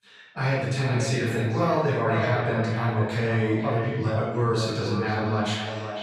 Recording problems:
echo of what is said; strong; throughout; 500 ms later, 8 dB below the speech
off-mic speech; far
room echo; noticeable; dies away in 1.1 s

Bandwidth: 13.5 kHz